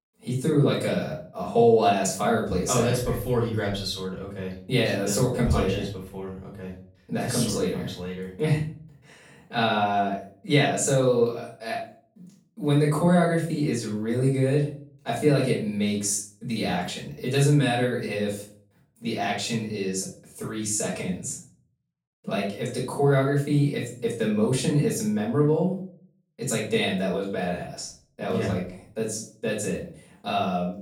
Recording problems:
off-mic speech; far
room echo; noticeable; dies away in 0.4 s

